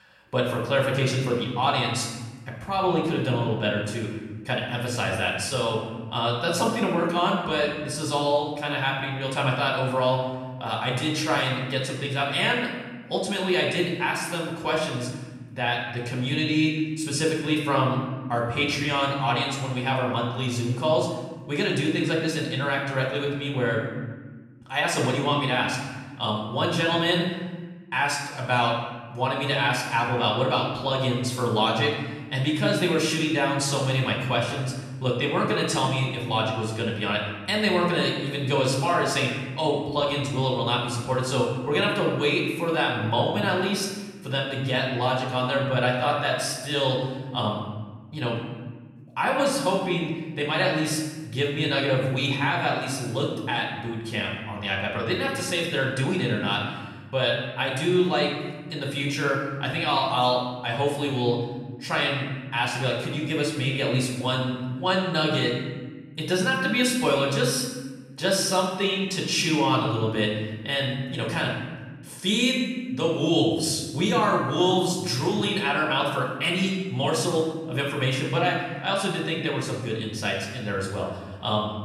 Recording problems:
off-mic speech; far
room echo; noticeable; dies away in 1.3 s

